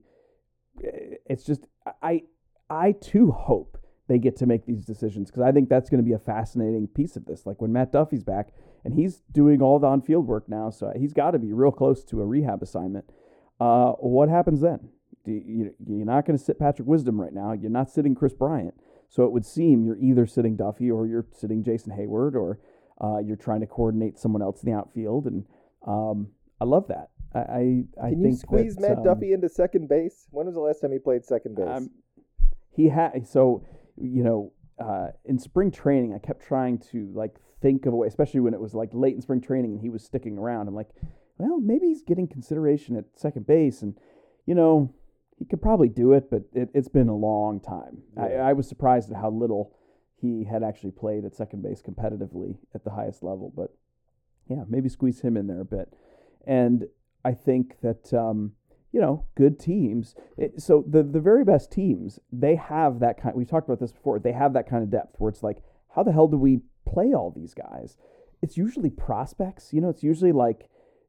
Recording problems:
muffled; very; fading above 1 kHz

